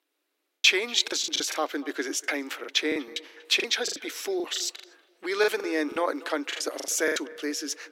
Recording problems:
thin; very; fading below 300 Hz
echo of what is said; faint; throughout; 240 ms later, 20 dB below the speech
choppy; very; 15% of the speech affected

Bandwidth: 16 kHz